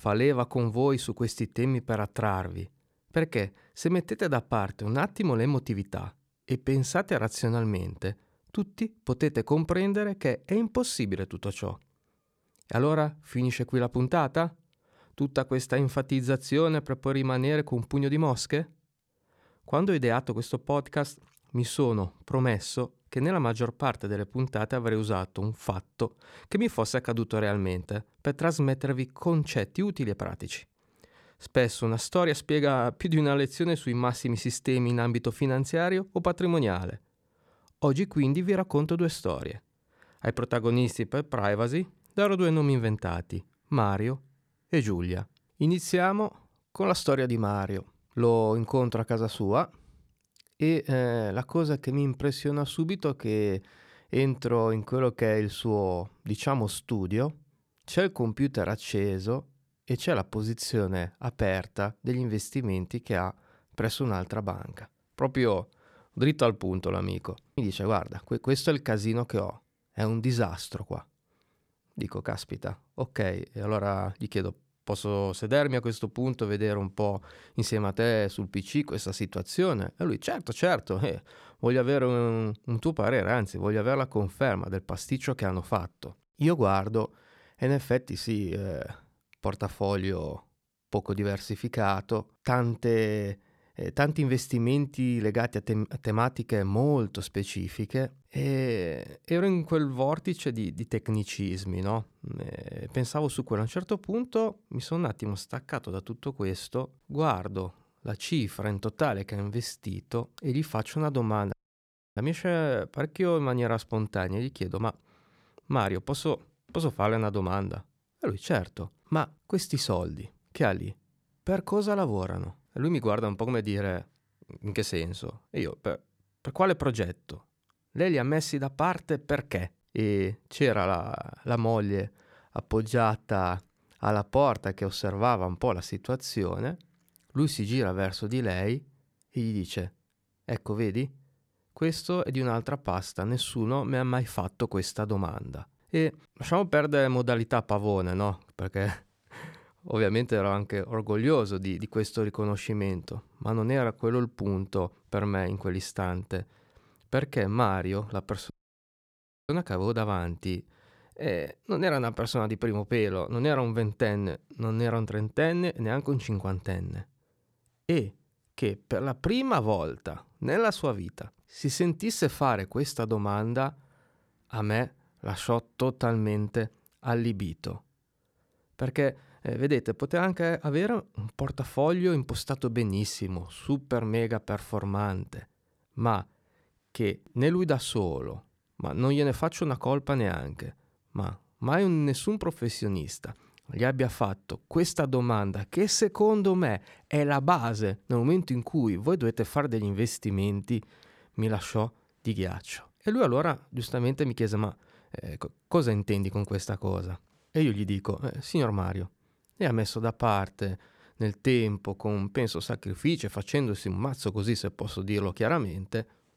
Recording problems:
audio cutting out; at 1:52 for 0.5 s and at 2:39 for 1 s

